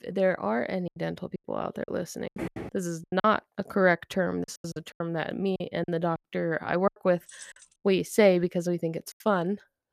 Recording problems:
choppy; very; 12% of the speech affected
footsteps; noticeable; at 2.5 s; peak 8 dB below the speech
jangling keys; faint; at 7.5 s; peak 20 dB below the speech

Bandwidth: 14.5 kHz